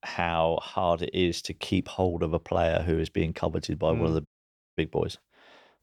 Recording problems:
audio cutting out; at 4.5 s for 0.5 s

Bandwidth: 19 kHz